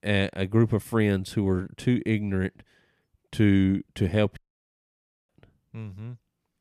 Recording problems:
audio cutting out; at 4.5 s for 1 s

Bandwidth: 14.5 kHz